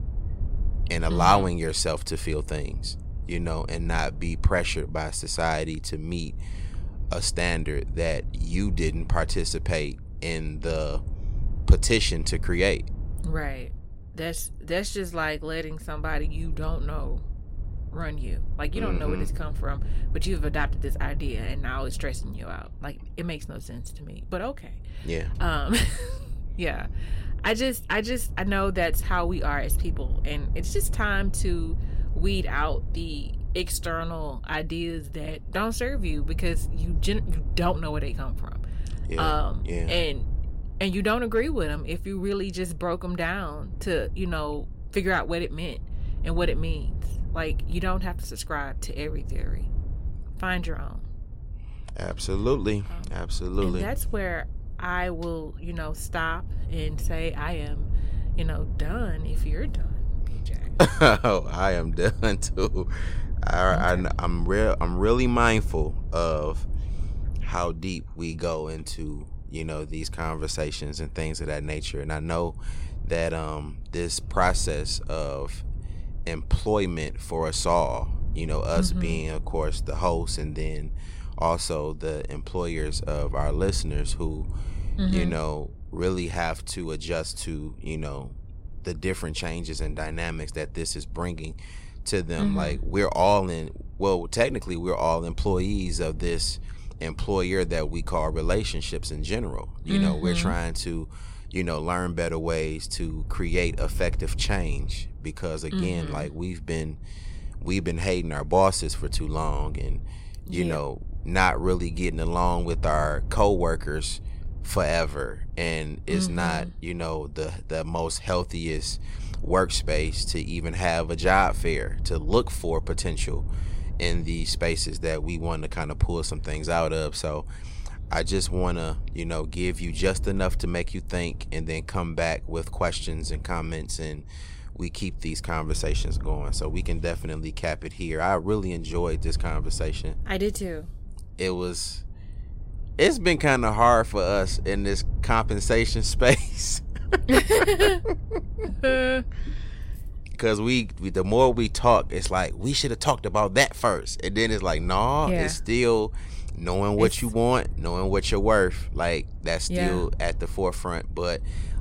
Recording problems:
wind noise on the microphone; occasional gusts; 25 dB below the speech

